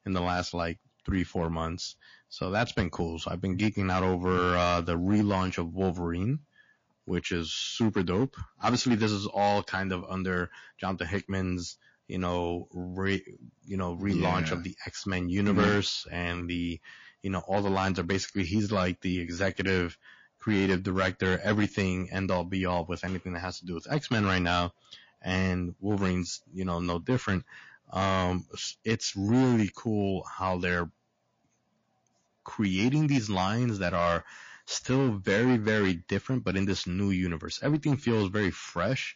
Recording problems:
distortion; slight; 3% of the sound clipped
garbled, watery; slightly

